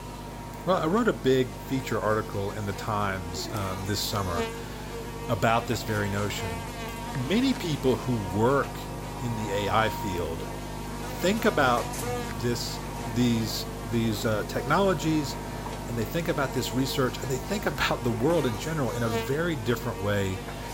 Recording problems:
electrical hum; loud; throughout; 50 Hz, 8 dB below the speech

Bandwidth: 16 kHz